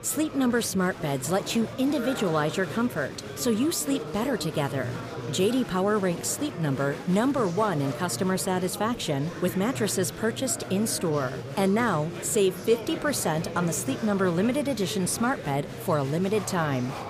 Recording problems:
murmuring crowd; loud; throughout; 10 dB below the speech

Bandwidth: 15 kHz